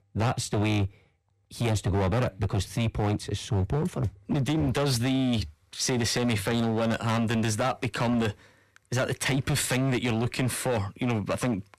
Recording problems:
distortion; heavy; 19% of the sound clipped

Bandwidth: 14 kHz